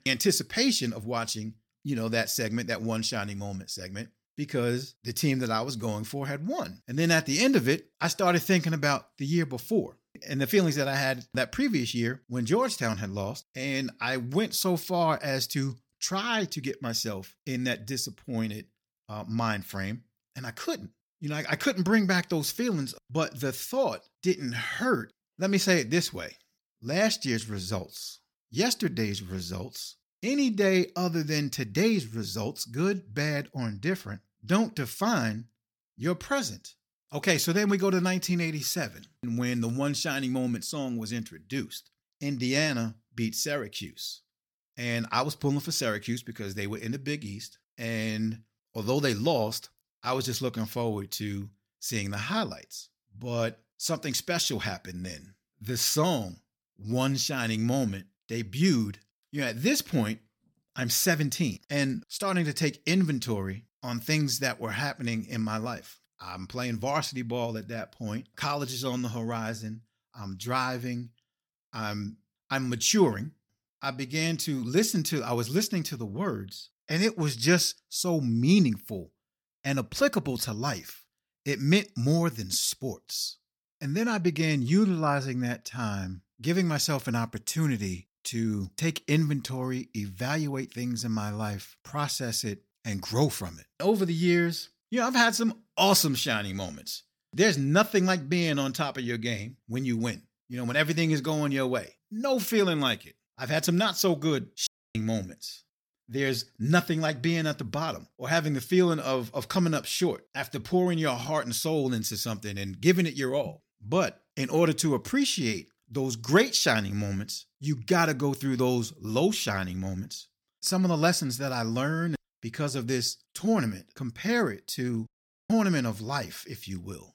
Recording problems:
audio cutting out; at 1:45 and at 2:05

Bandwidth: 17.5 kHz